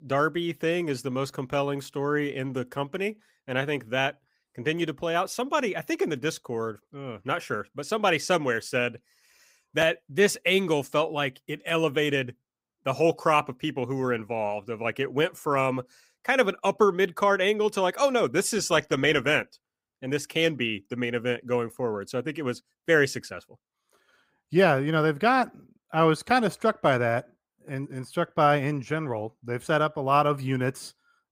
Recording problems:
none

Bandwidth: 15.5 kHz